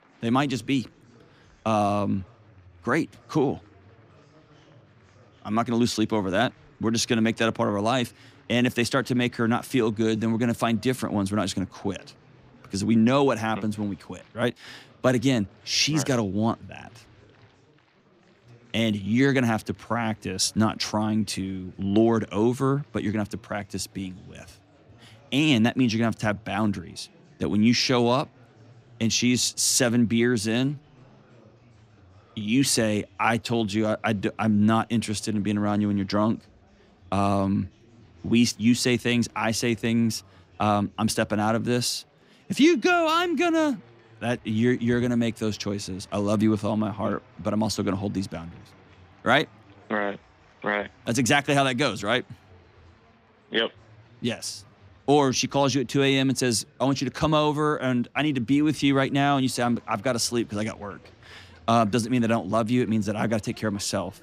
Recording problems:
chatter from many people; faint; throughout; 30 dB below the speech

